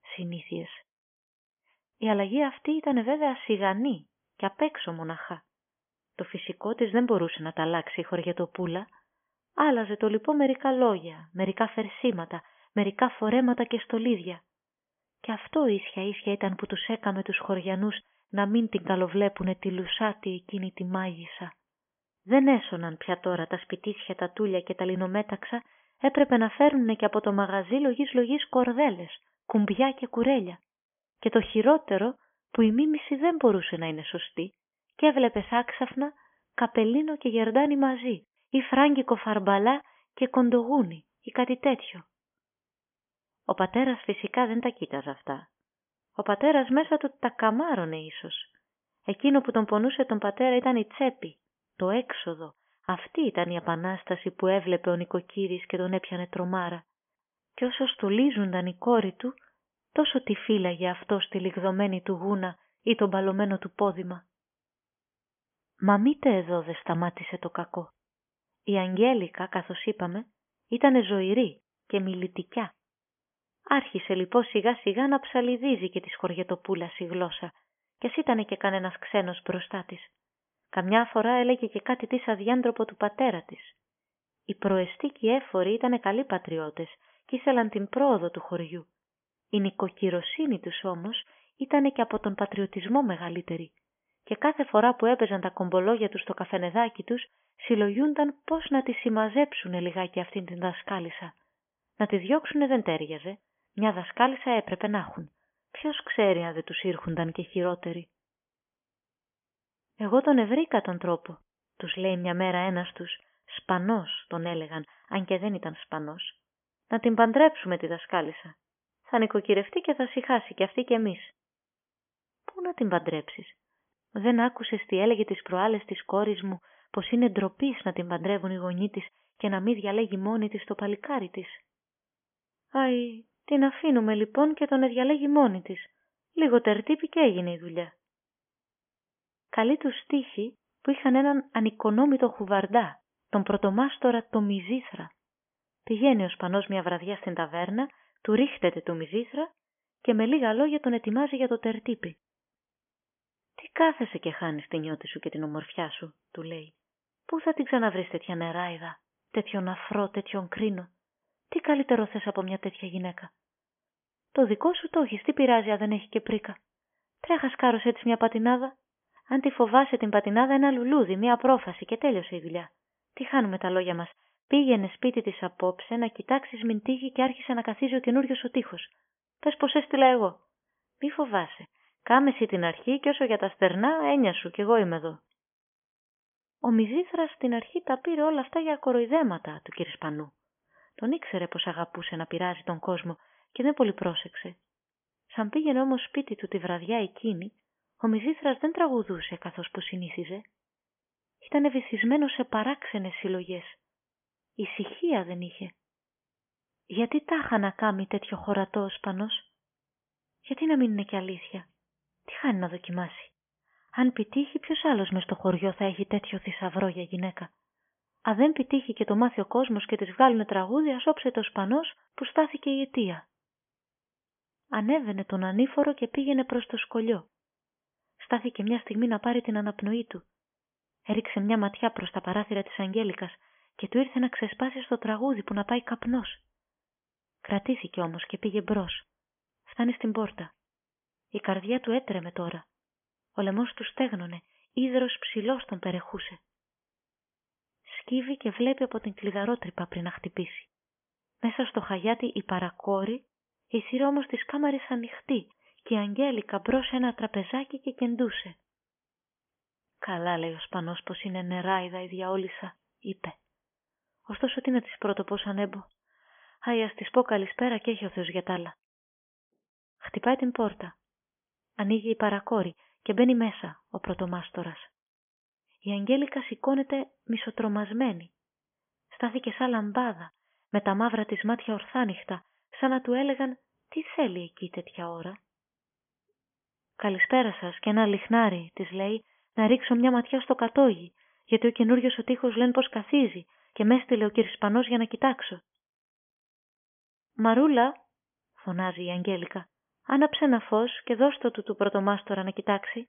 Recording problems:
high frequencies cut off; severe; nothing above 3.5 kHz

